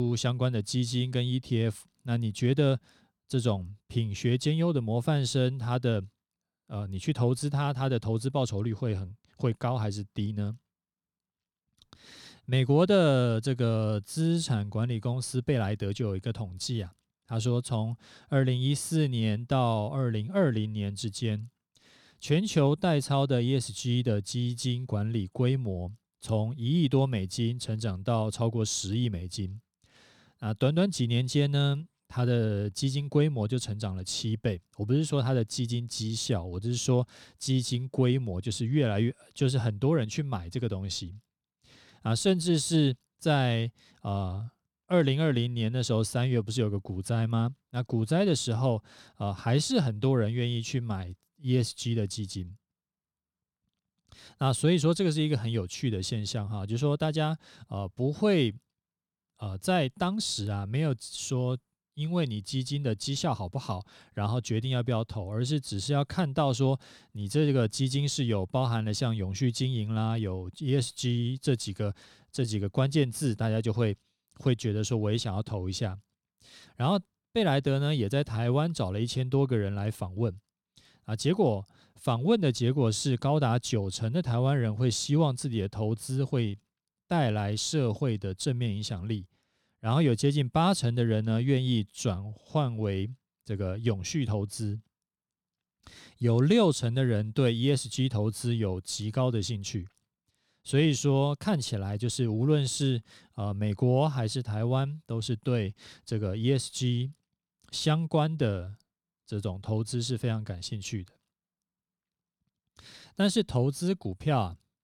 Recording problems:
abrupt cut into speech; at the start

